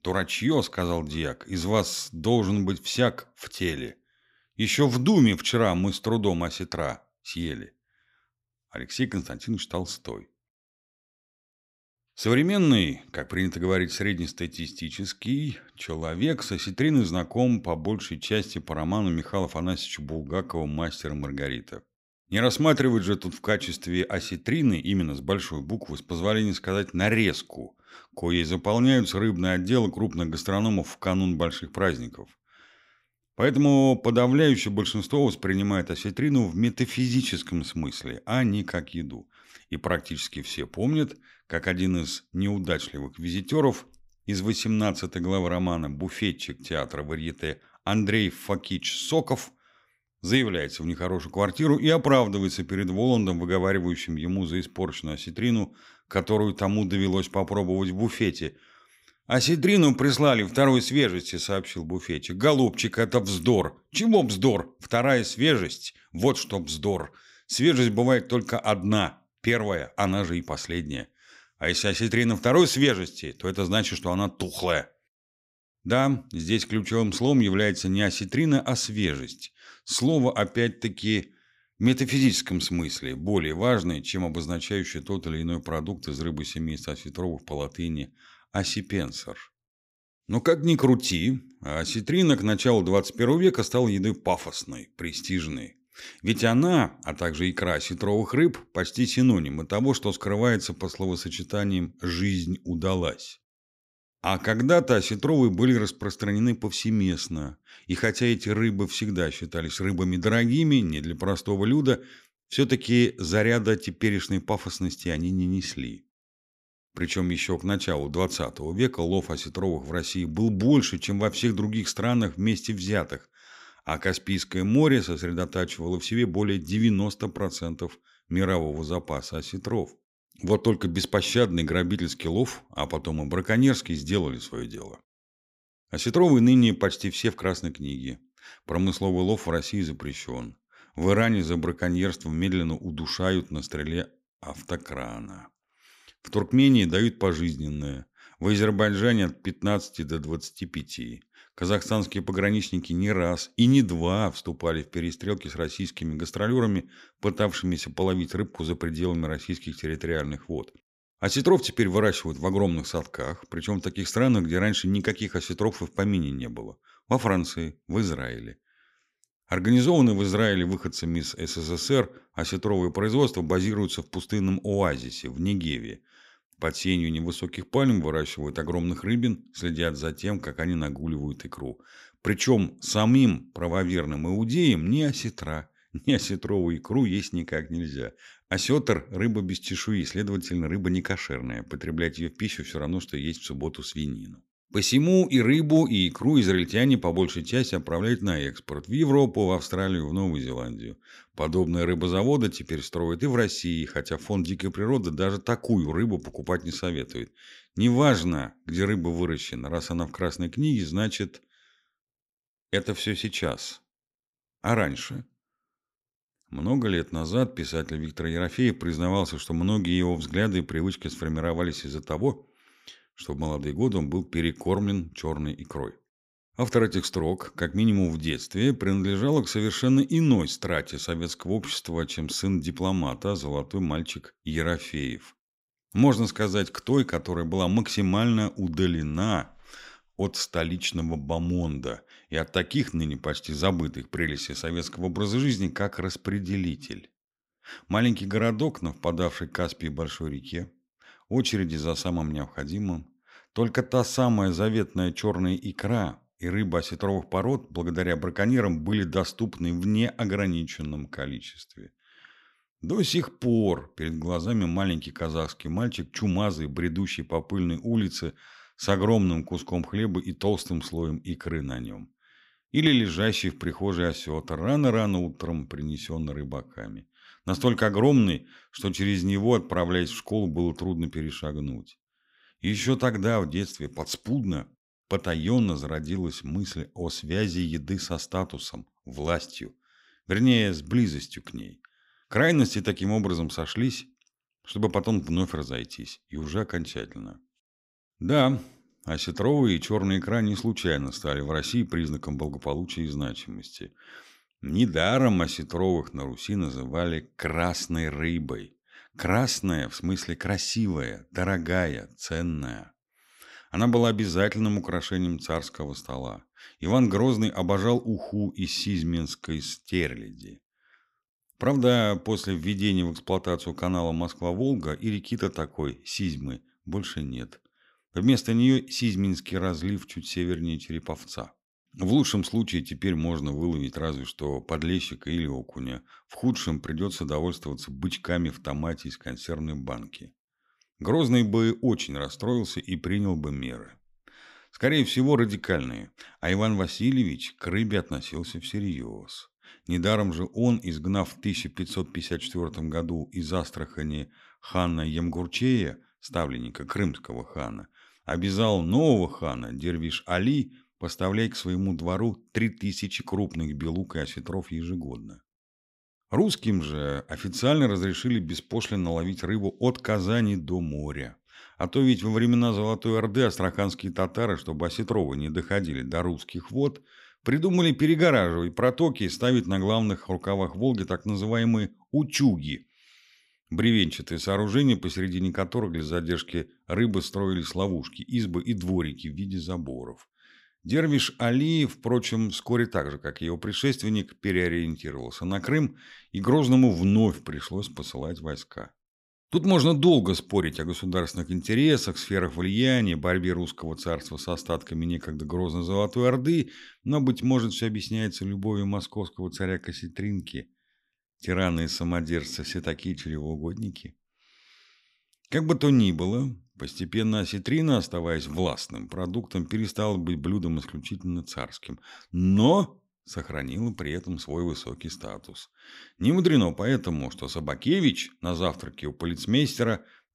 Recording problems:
none

